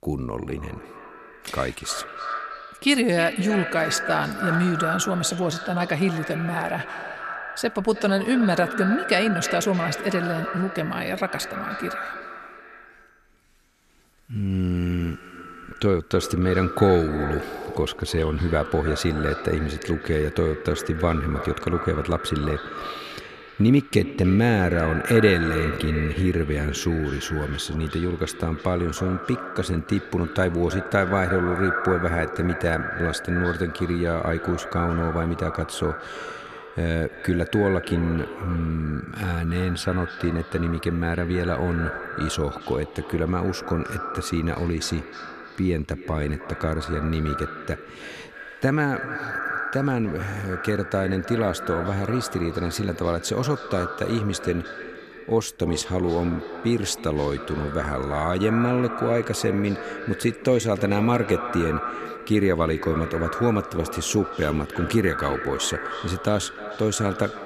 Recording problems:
echo of what is said; strong; throughout; 310 ms later, 8 dB below the speech

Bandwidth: 14 kHz